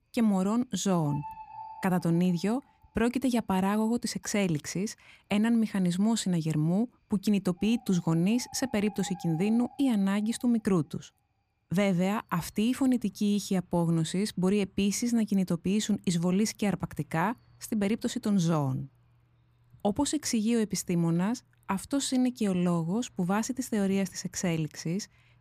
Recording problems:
animal sounds; faint; throughout; 25 dB below the speech

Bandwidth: 15 kHz